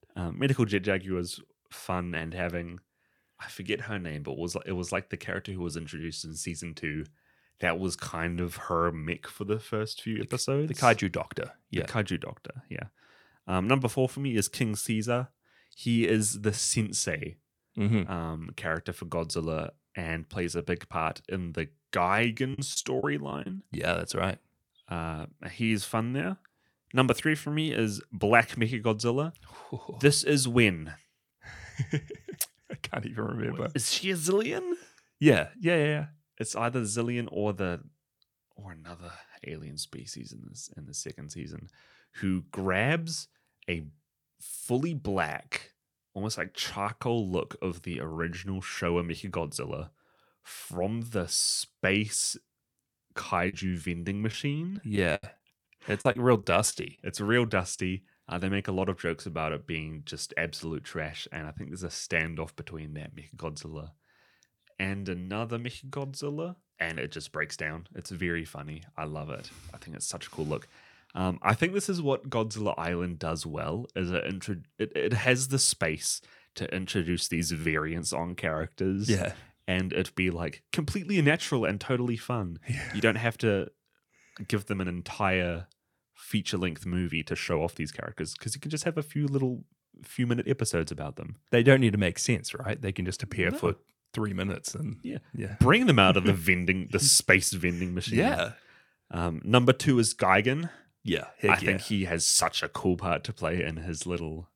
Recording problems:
choppy; very; at 23 s and from 53 to 58 s; 9% of the speech affected

